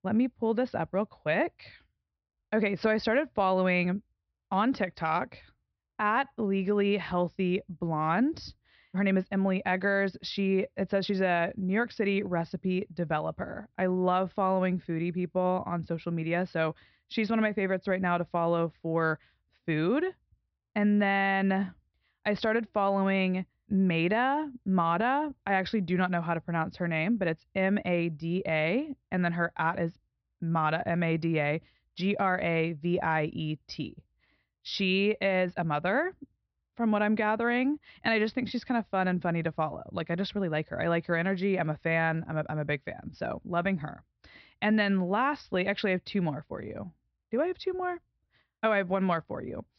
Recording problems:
high frequencies cut off; noticeable; nothing above 5.5 kHz

